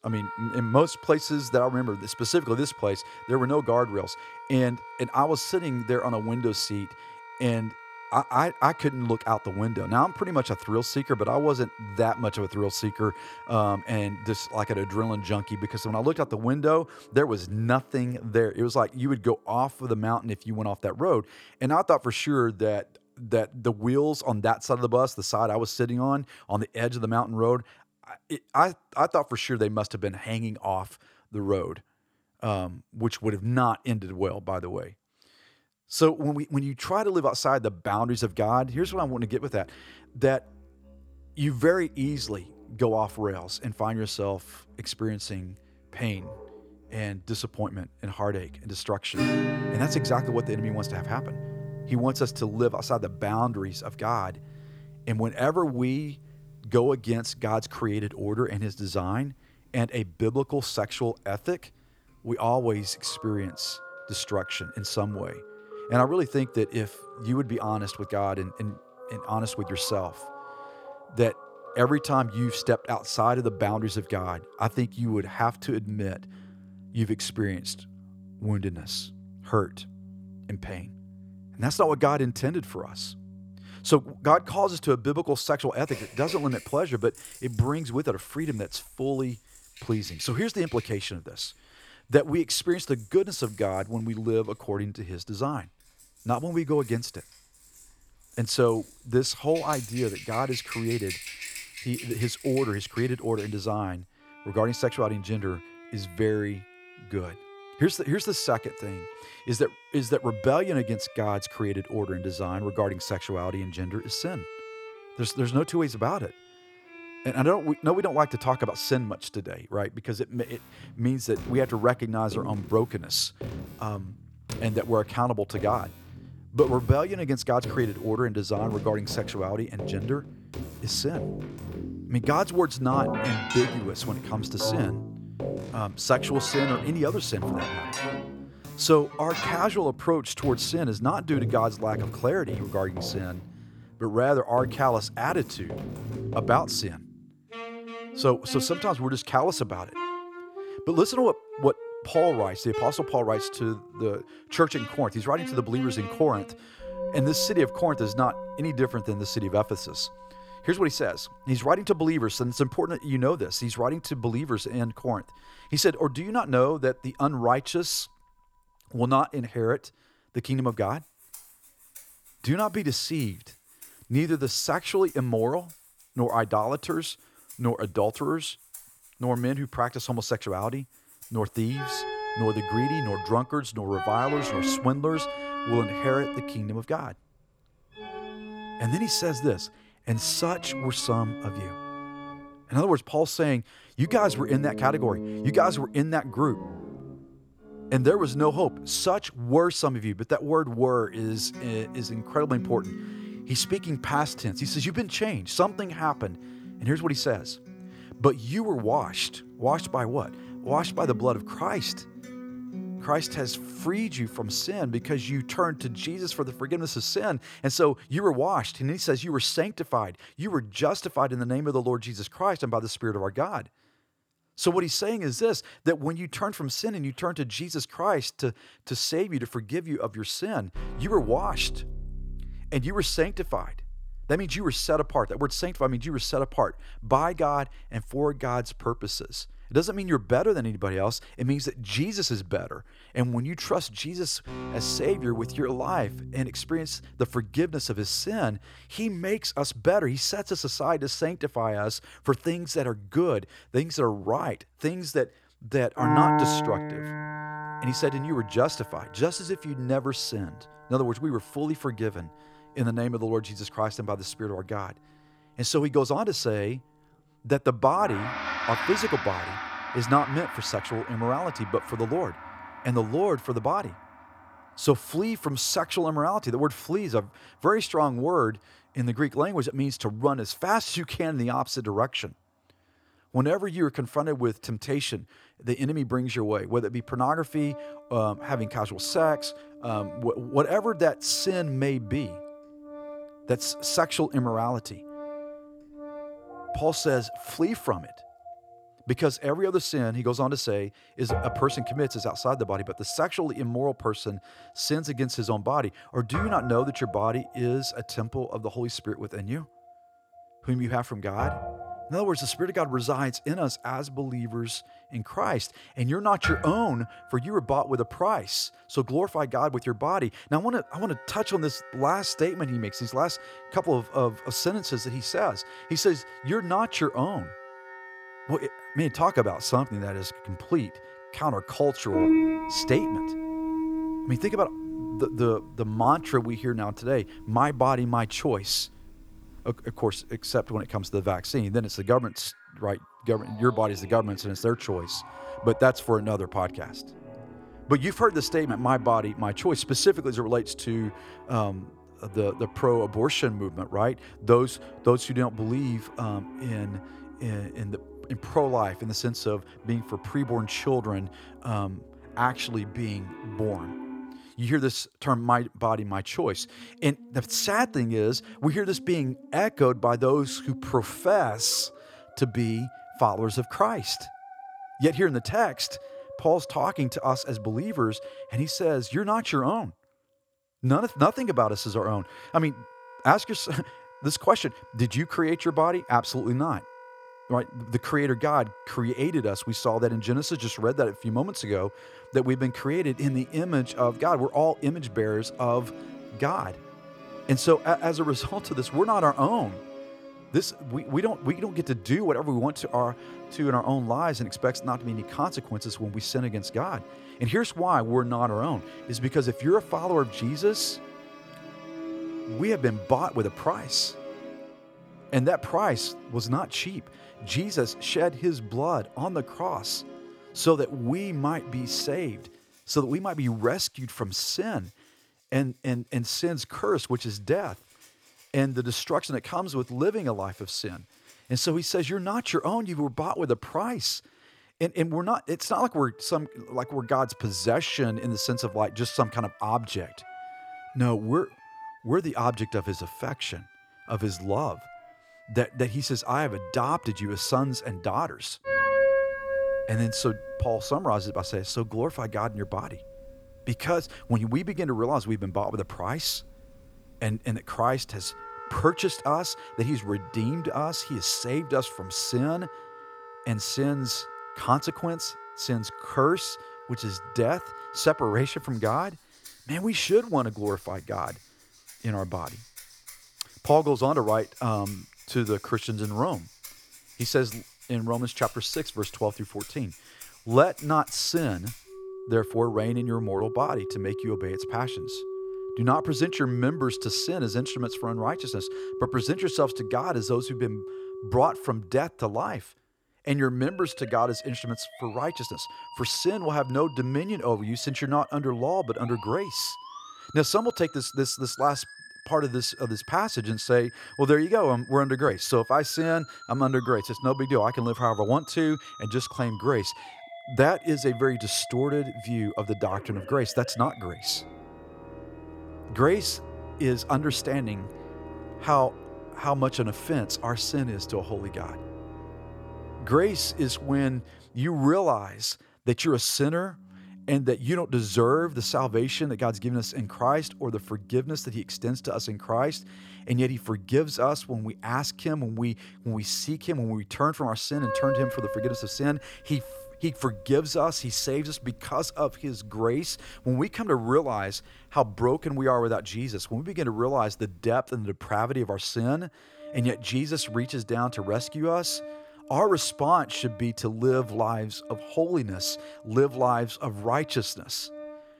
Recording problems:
background music; noticeable; throughout; 10 dB below the speech

